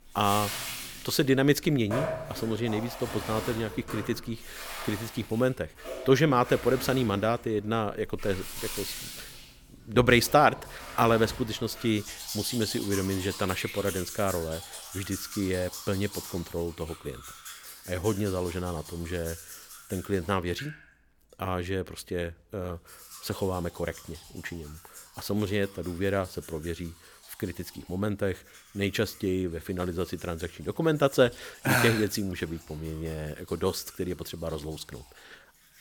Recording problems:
household noises; noticeable; throughout; 10 dB below the speech

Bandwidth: 19 kHz